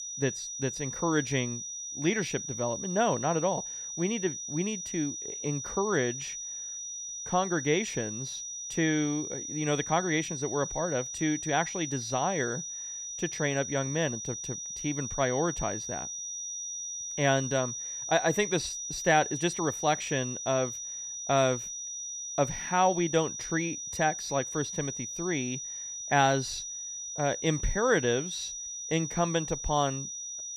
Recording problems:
high-pitched whine; loud; throughout; 6 kHz, 5 dB below the speech

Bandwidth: 15 kHz